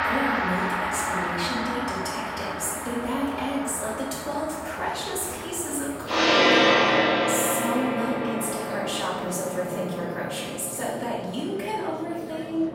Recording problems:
off-mic speech; far
room echo; noticeable; dies away in 1 s
background music; very loud; throughout; 4 dB above the speech
murmuring crowd; noticeable; throughout; 10 dB below the speech

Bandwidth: 16 kHz